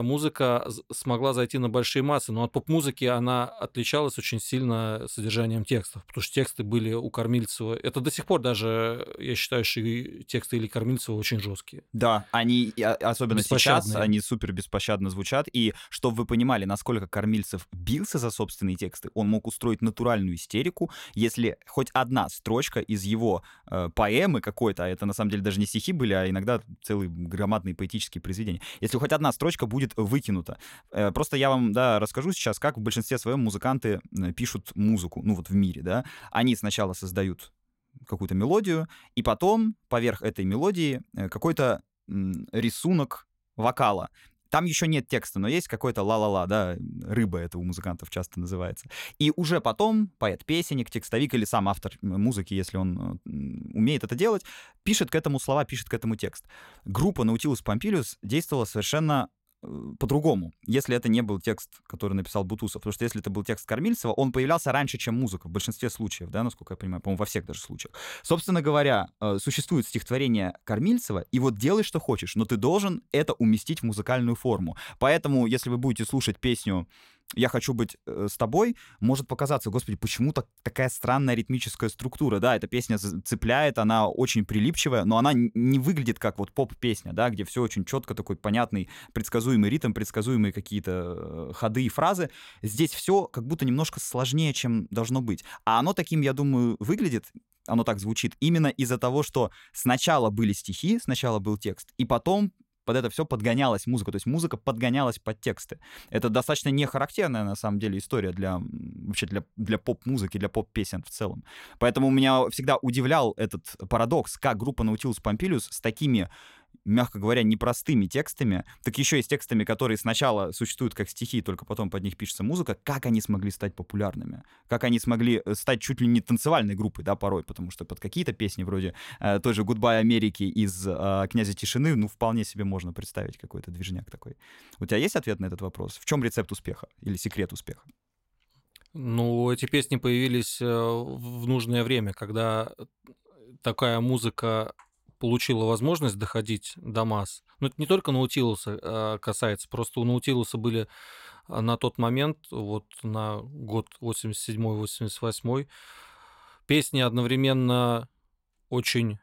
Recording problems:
abrupt cut into speech; at the start

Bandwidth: 16 kHz